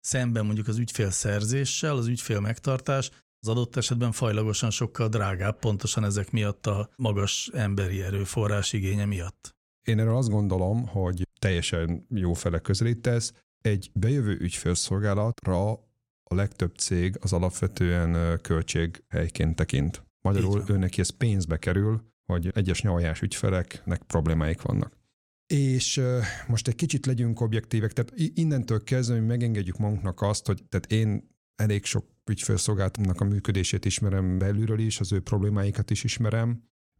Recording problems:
none

